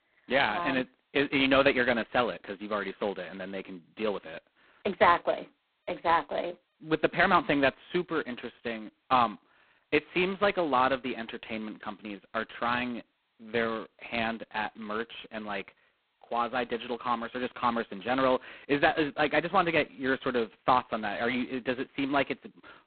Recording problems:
phone-call audio; poor line; nothing above 4 kHz

